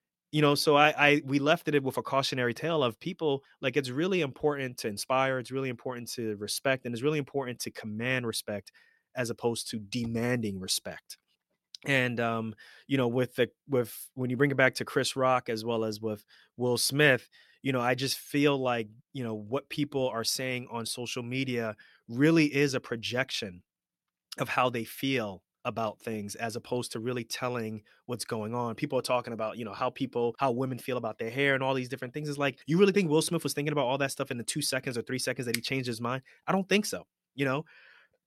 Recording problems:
none

